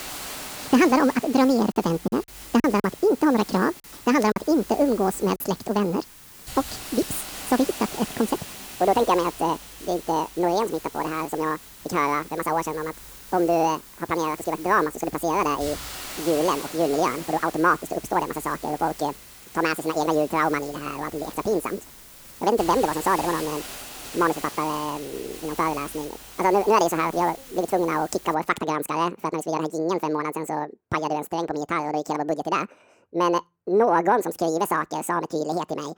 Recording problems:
wrong speed and pitch; too fast and too high; 1.7 times normal speed
hiss; noticeable; until 28 s; 15 dB below the speech
choppy; very; from 2 to 5.5 s; 7% of the speech affected

